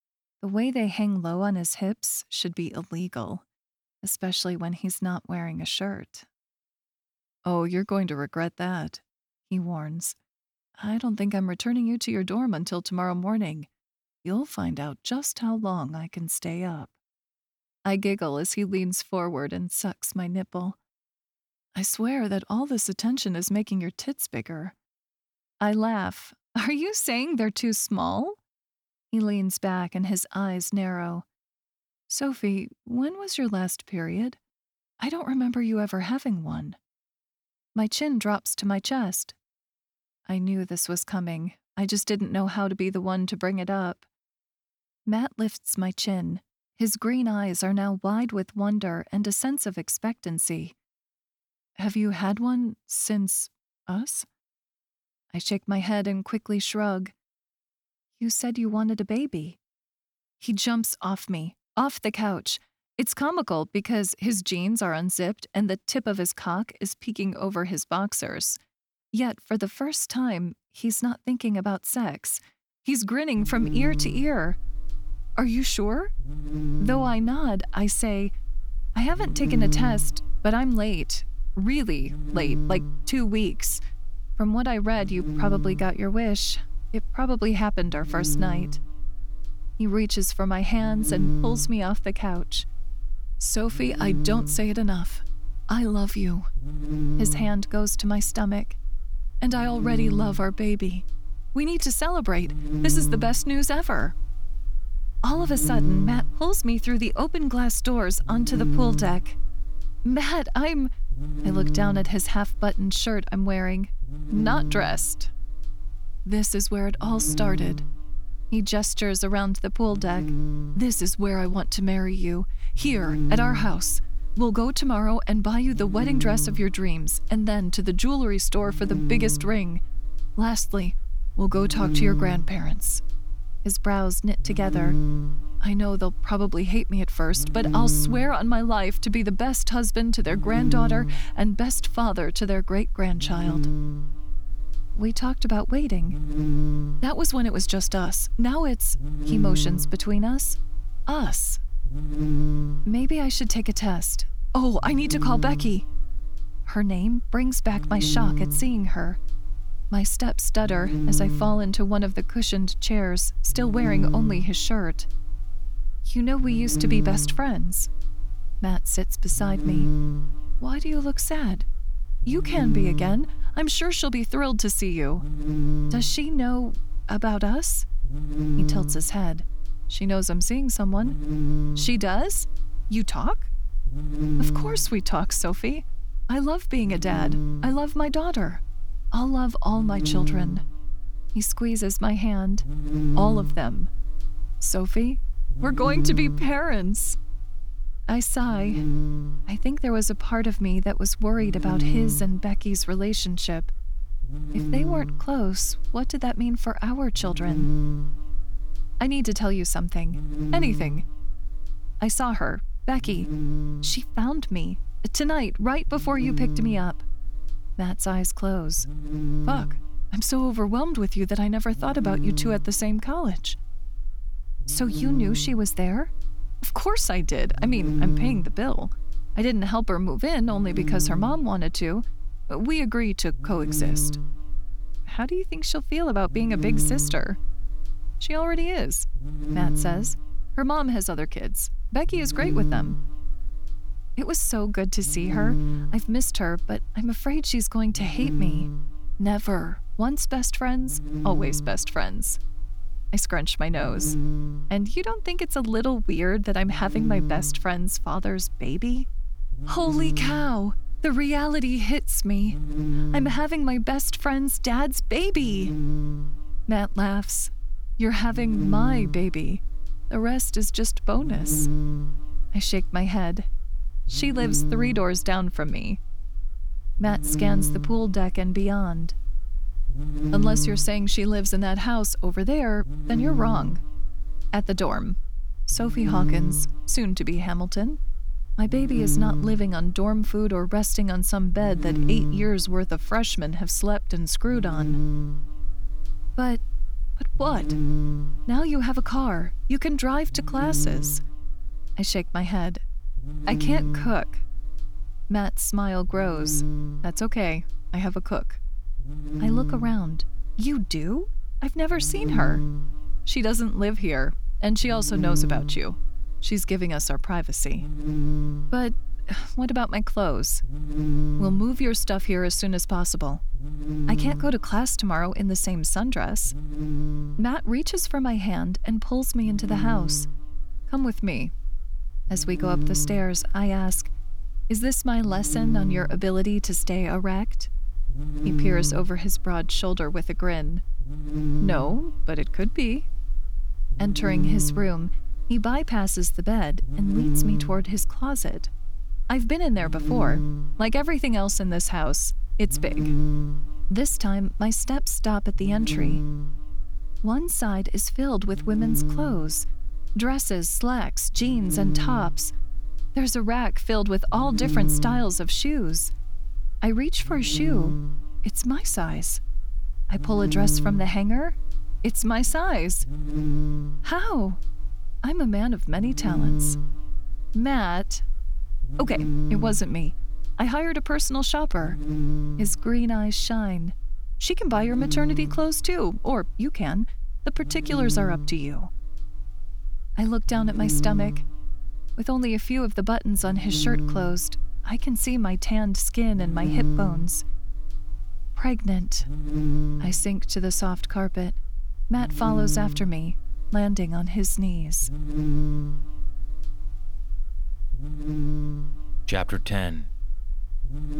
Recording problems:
electrical hum; very faint; from 1:13 on; 60 Hz, 8 dB below the speech

